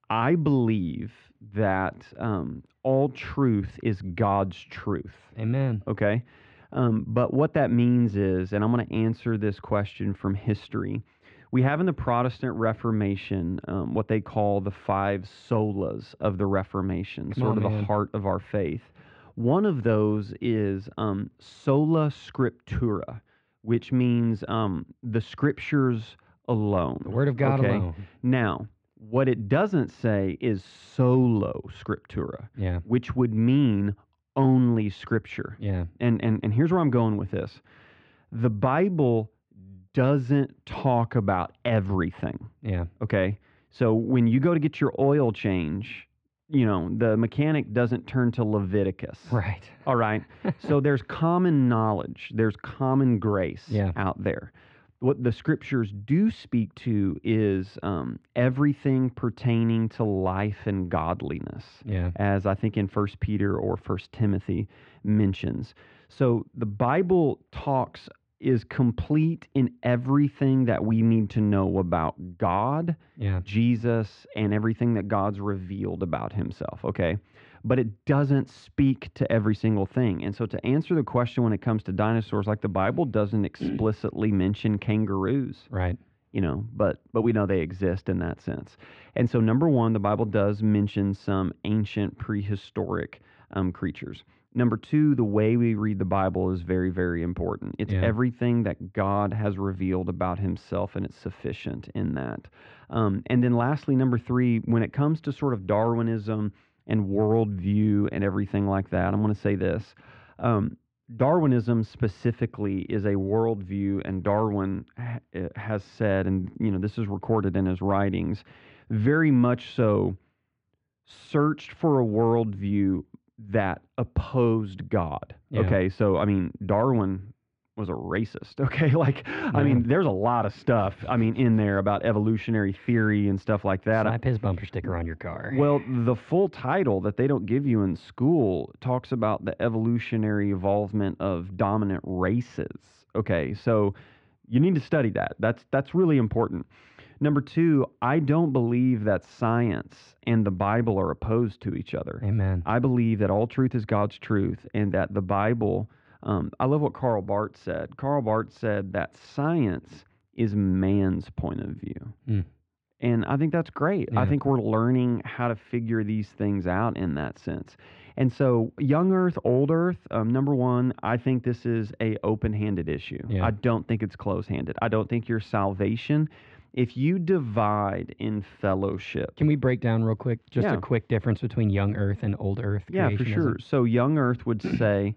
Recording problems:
muffled; very; fading above 2.5 kHz

